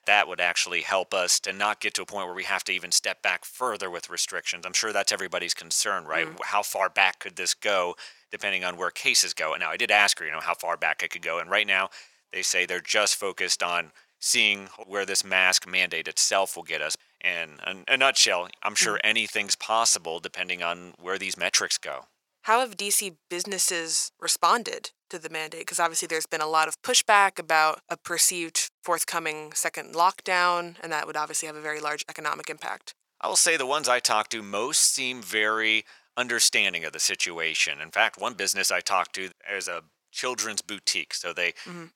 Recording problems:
thin; very; fading below 750 Hz

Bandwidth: 18 kHz